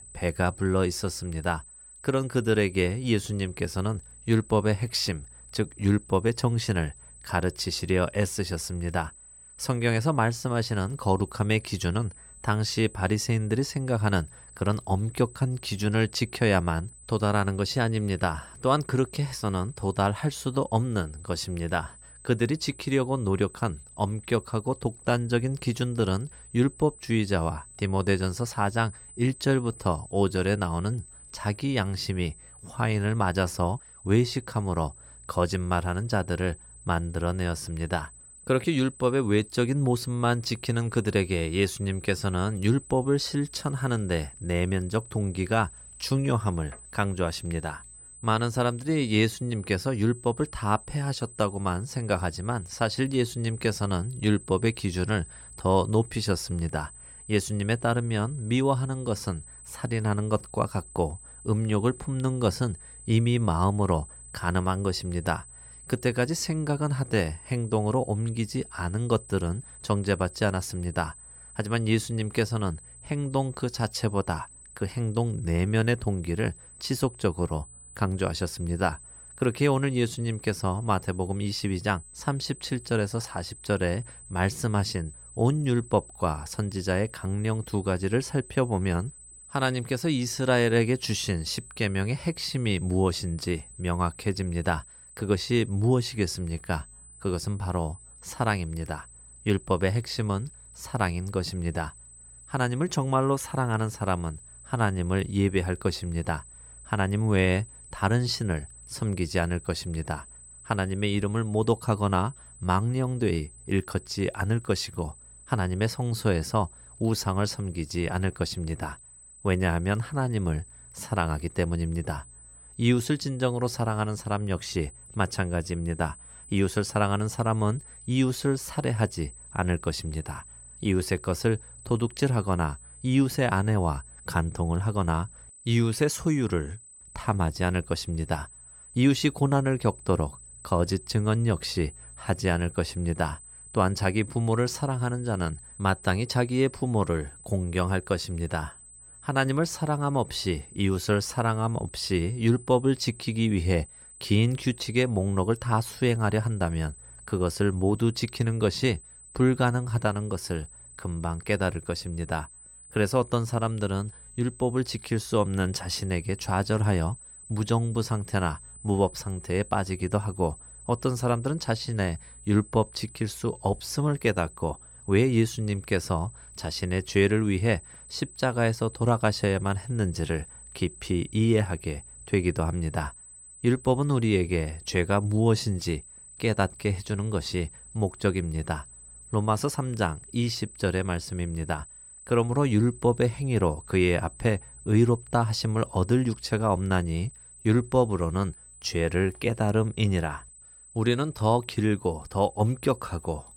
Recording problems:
high-pitched whine; noticeable; throughout; 8 kHz, 20 dB below the speech

